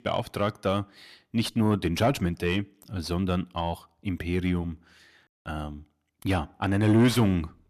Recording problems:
distortion; slight; 10 dB below the speech

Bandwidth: 14 kHz